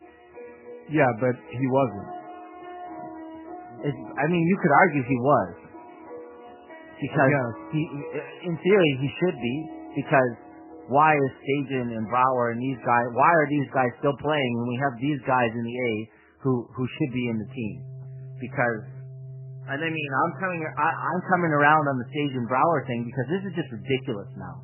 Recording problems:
garbled, watery; badly; nothing above 3 kHz
background music; noticeable; throughout; 15 dB below the speech

